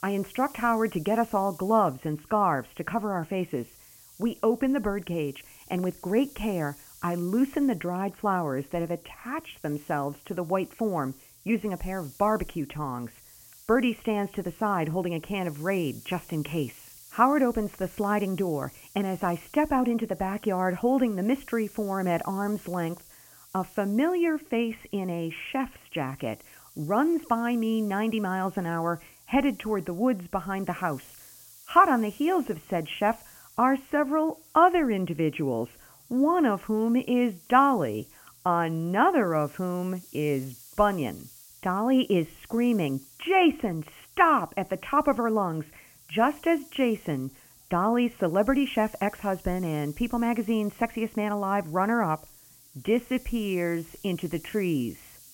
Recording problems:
high frequencies cut off; severe; nothing above 3.5 kHz
hiss; faint; throughout; 20 dB below the speech

